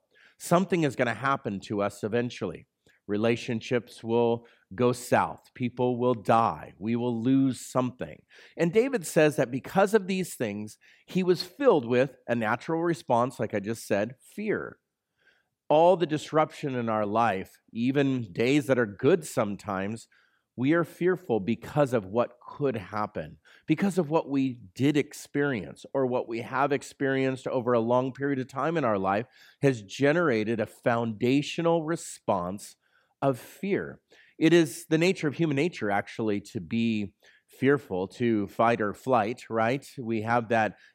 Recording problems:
none

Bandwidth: 16 kHz